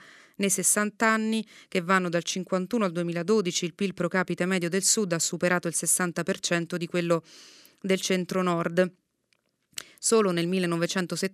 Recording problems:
none

